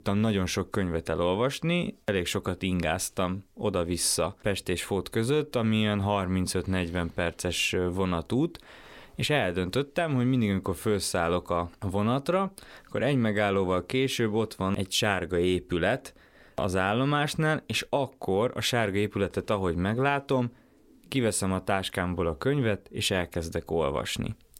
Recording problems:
none

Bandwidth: 16.5 kHz